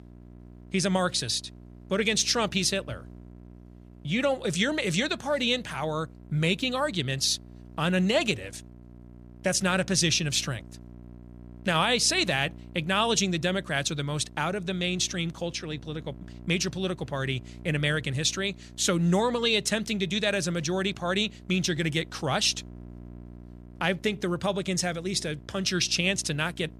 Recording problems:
electrical hum; faint; throughout; 60 Hz, 30 dB below the speech

